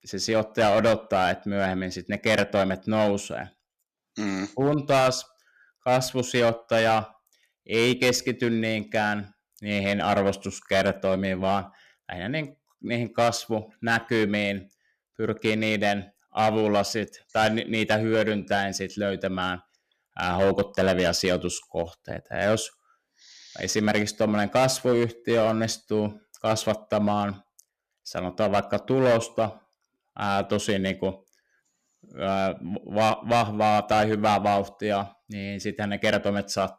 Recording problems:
distortion; slight; 5% of the sound clipped

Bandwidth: 14.5 kHz